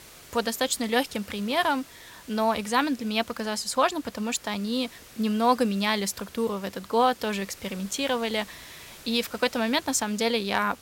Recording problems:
hiss; faint; throughout; 20 dB below the speech

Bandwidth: 16.5 kHz